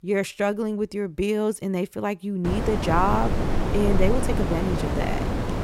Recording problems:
wind noise on the microphone; heavy; from 2.5 s on; 4 dB below the speech
door banging; noticeable; from 3 to 5 s; peak 8 dB below the speech

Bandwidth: 16 kHz